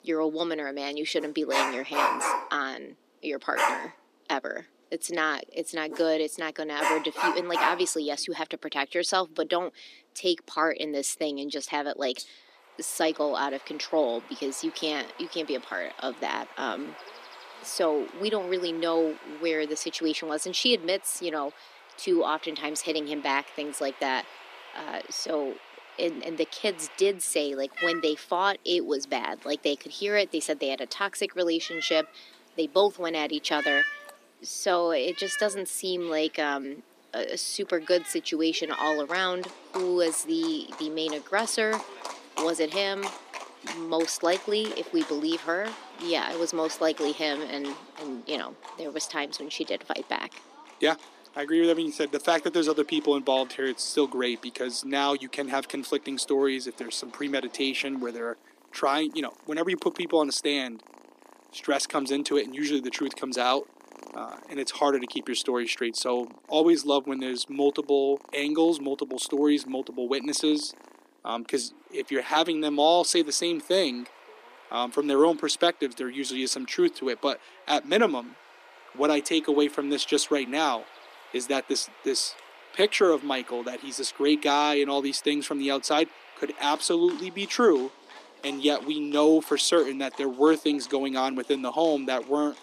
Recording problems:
thin; somewhat; fading below 250 Hz
animal sounds; noticeable; throughout; 10 dB below the speech

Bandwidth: 14.5 kHz